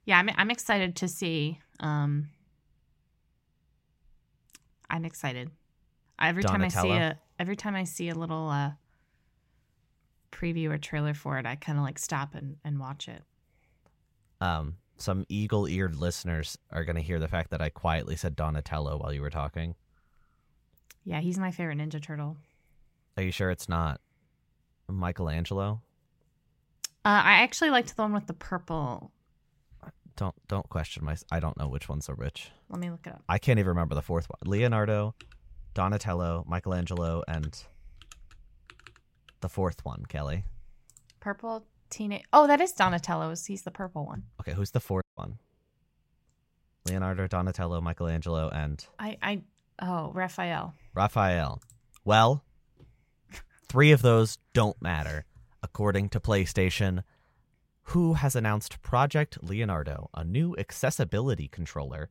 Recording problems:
audio cutting out; at 45 s

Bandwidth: 16 kHz